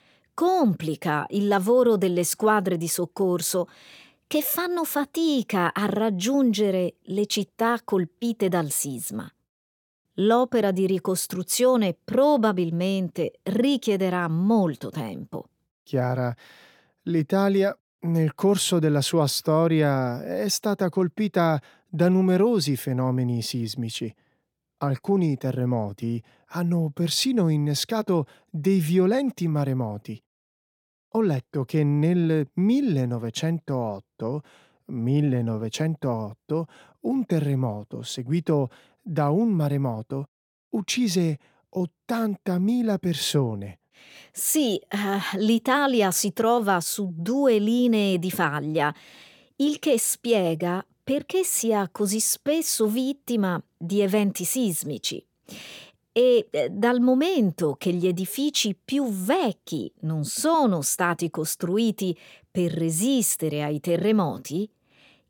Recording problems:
none

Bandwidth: 17 kHz